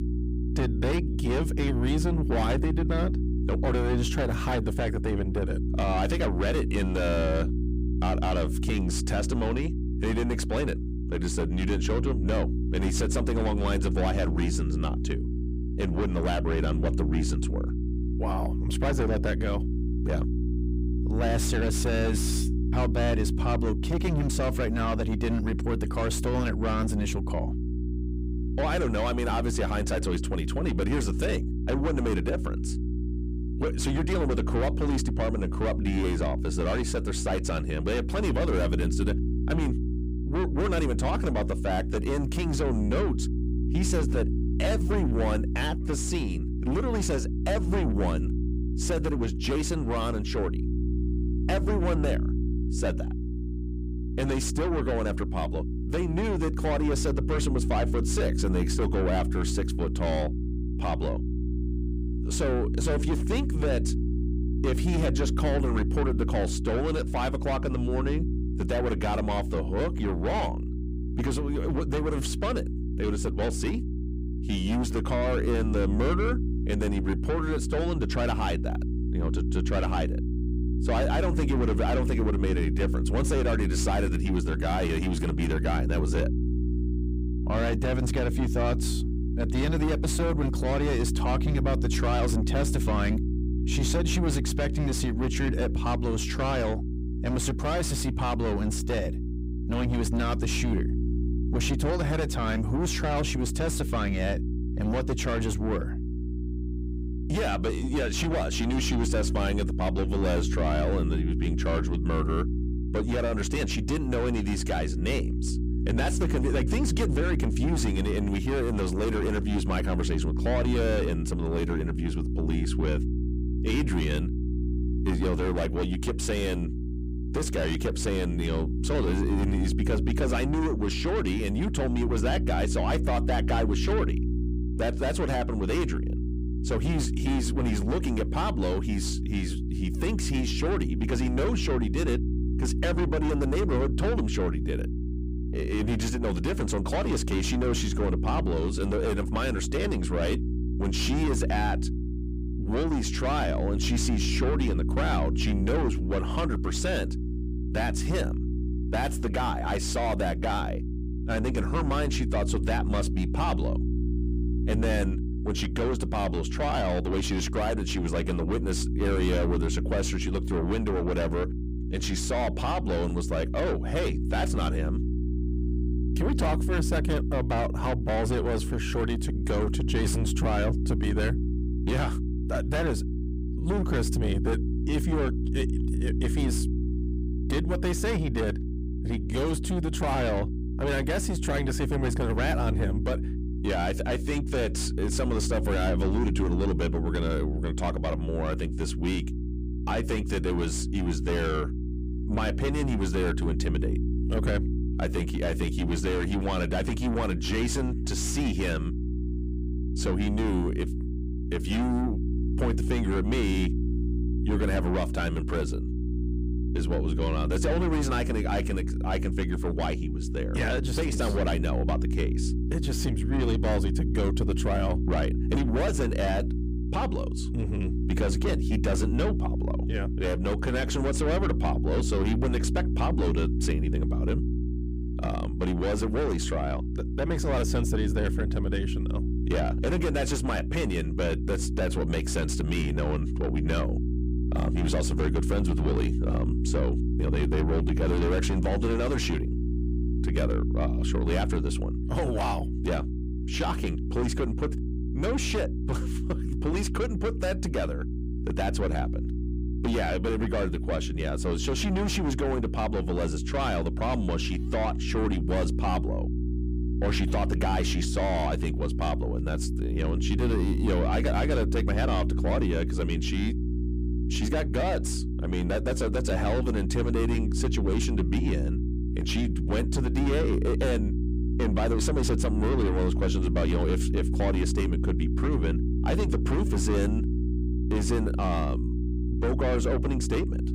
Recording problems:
distortion; heavy; 6 dB below the speech
electrical hum; loud; throughout; 60 Hz, 8 dB below the speech

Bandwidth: 15.5 kHz